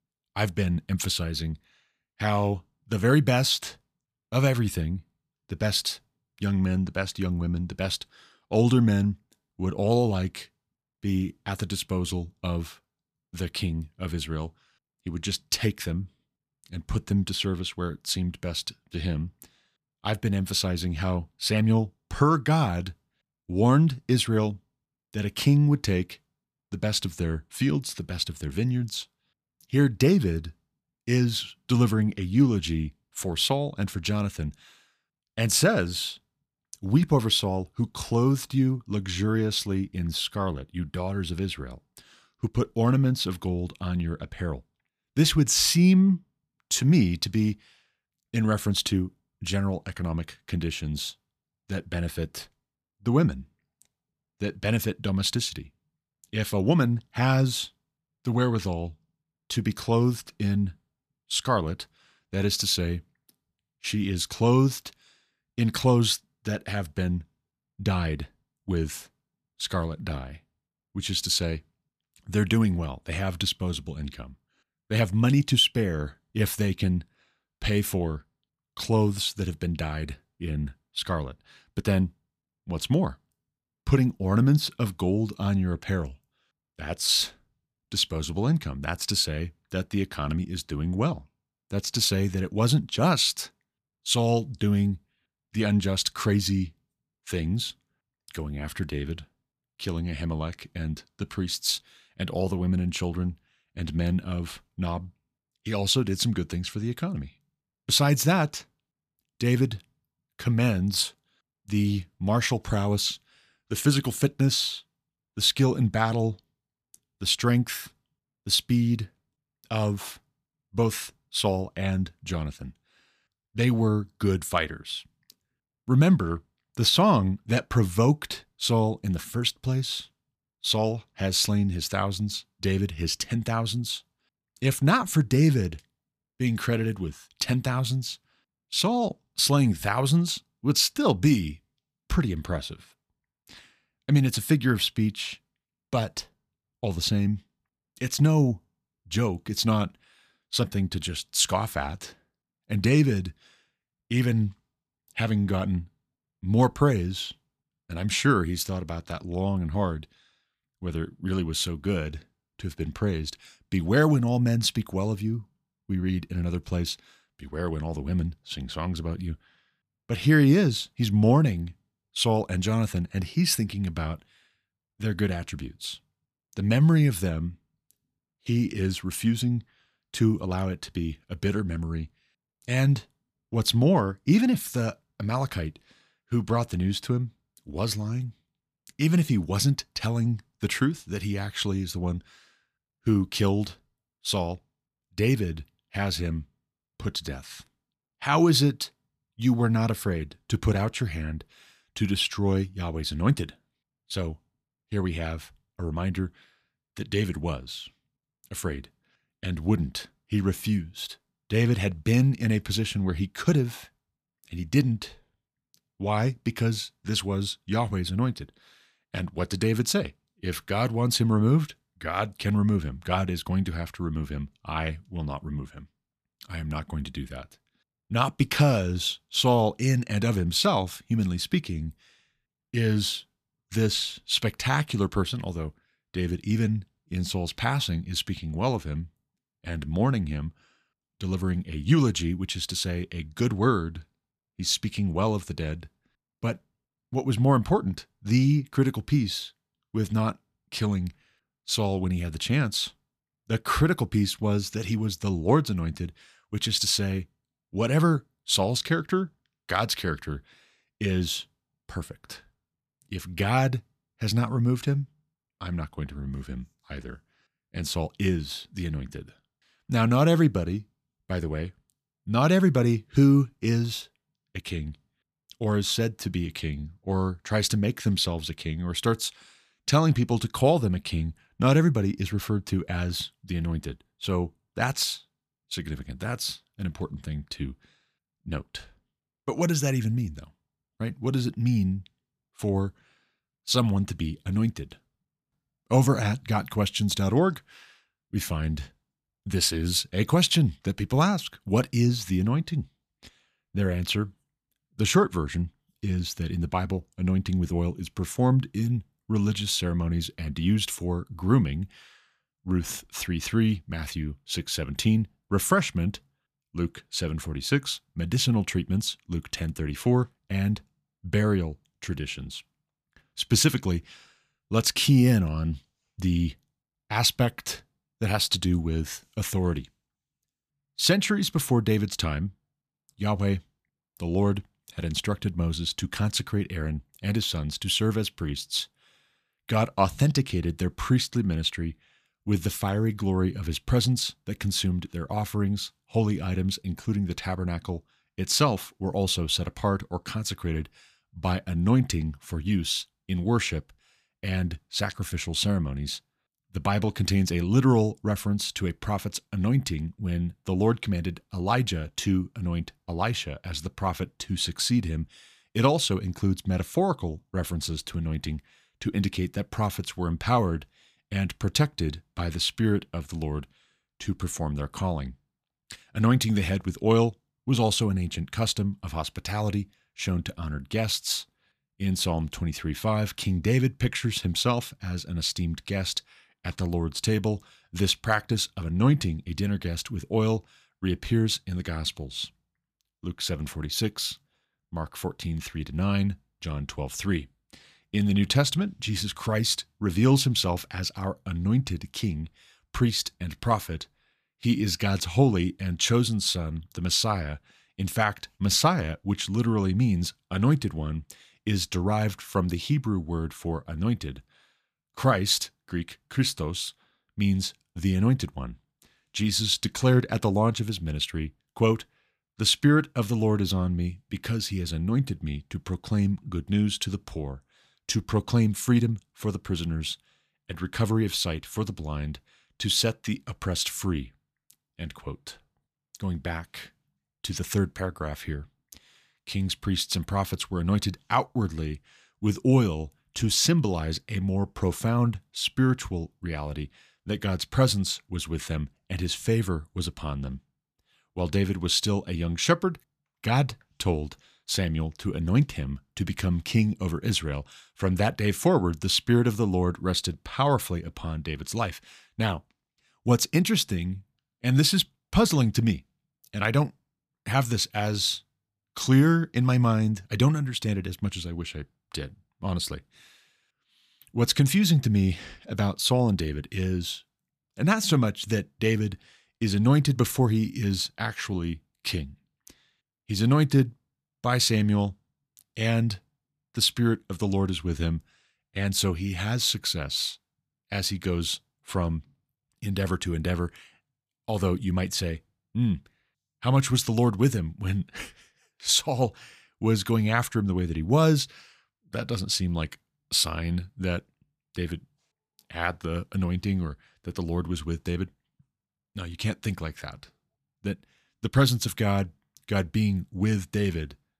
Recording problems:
none

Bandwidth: 14.5 kHz